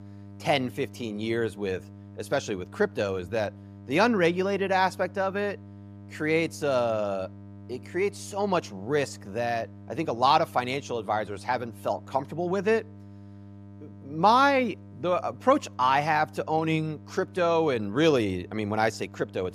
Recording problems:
electrical hum; faint; throughout; 50 Hz, 25 dB below the speech

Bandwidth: 15 kHz